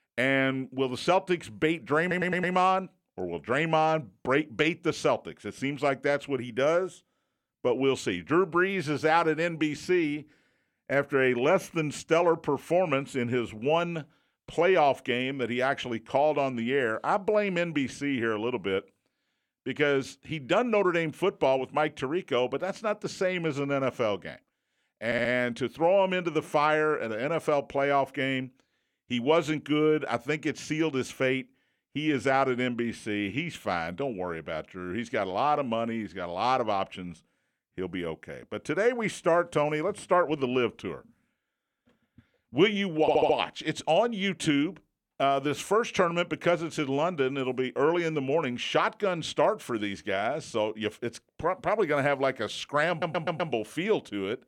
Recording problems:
audio stuttering; 4 times, first at 2 s

